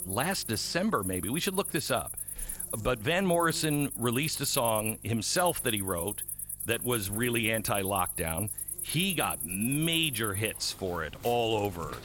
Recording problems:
animal sounds; loud; throughout; 5 dB below the speech
electrical hum; faint; throughout; 50 Hz, 30 dB below the speech

